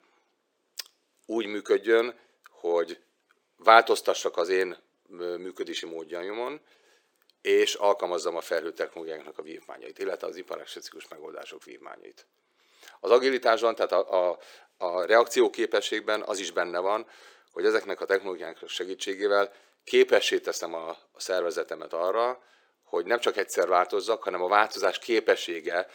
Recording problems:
thin; very; fading below 400 Hz

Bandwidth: 18 kHz